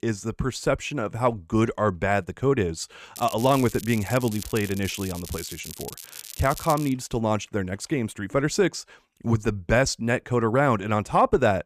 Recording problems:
crackling; noticeable; from 3 to 7 s; 15 dB below the speech

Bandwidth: 14.5 kHz